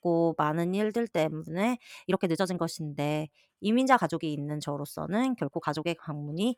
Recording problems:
uneven, jittery; strongly; from 1 to 6 s

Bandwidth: 19 kHz